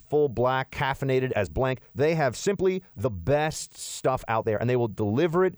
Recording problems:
uneven, jittery; strongly; from 1.5 to 4.5 s

